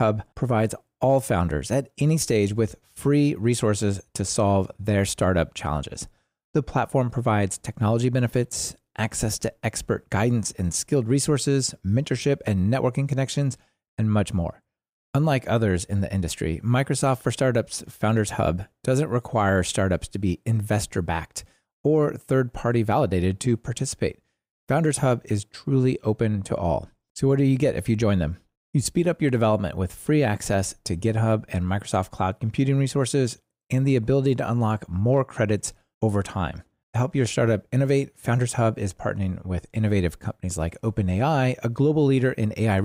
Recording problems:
abrupt cut into speech; at the start and the end

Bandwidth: 15.5 kHz